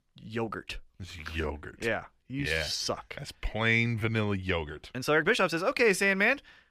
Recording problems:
uneven, jittery; strongly; from 1 to 5.5 s

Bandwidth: 15 kHz